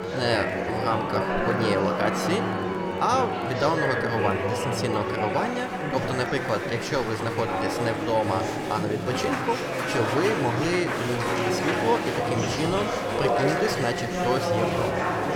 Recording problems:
chatter from many people; very loud; throughout; as loud as the speech
background music; loud; throughout; 7 dB below the speech
siren; noticeable; until 4 s; peak 7 dB below the speech
door banging; noticeable; from 11 s on; peak 5 dB below the speech

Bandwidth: 17.5 kHz